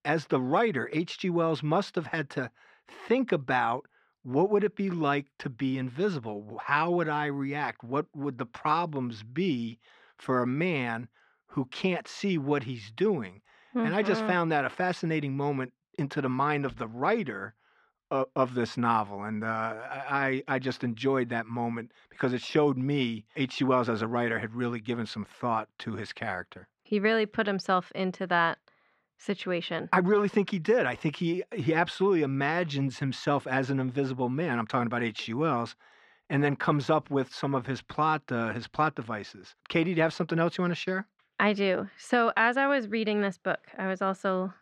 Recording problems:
muffled; slightly; fading above 2.5 kHz

